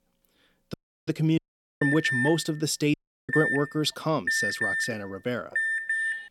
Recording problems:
audio cutting out; at 0.5 s, at 1.5 s and at 3 s
alarm; loud; from 2 s on; peak 3 dB above the speech

